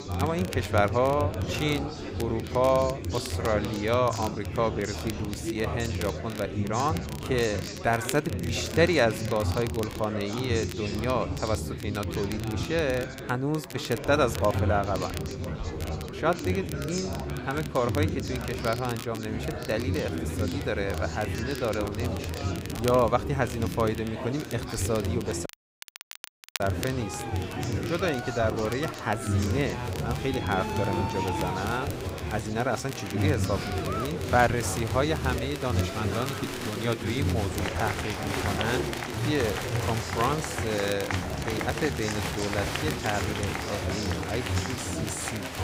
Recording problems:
chatter from many people; loud; throughout; 3 dB below the speech
crackle, like an old record; noticeable; 15 dB below the speech
audio cutting out; at 25 s for 1 s

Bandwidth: 15.5 kHz